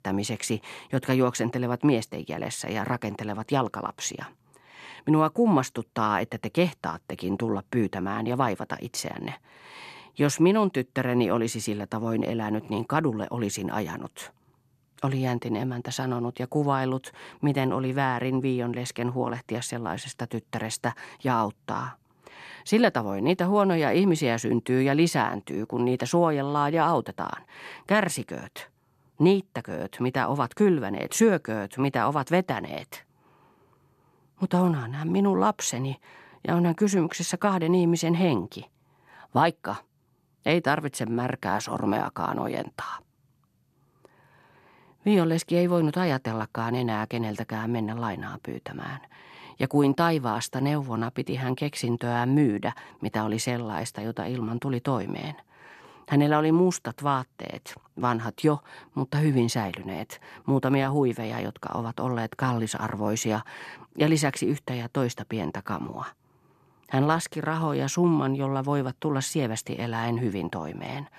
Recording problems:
none

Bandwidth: 14 kHz